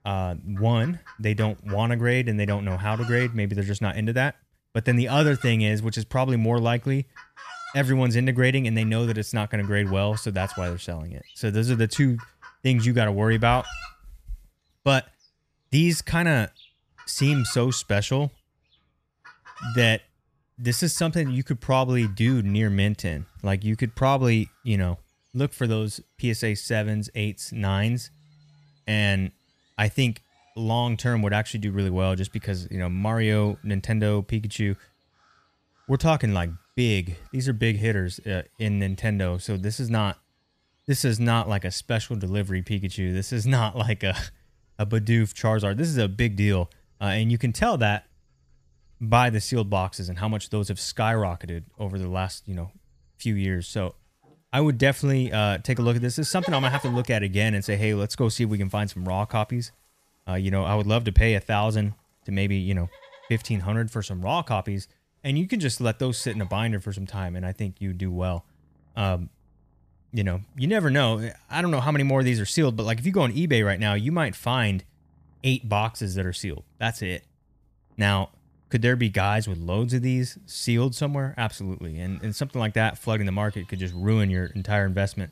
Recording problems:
animal sounds; noticeable; throughout; 20 dB below the speech

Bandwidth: 14.5 kHz